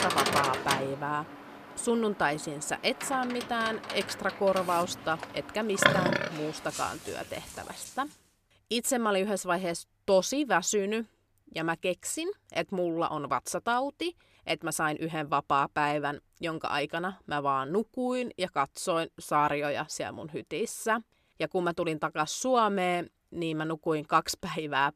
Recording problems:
animal sounds; loud; until 8 s; 2 dB below the speech

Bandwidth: 14.5 kHz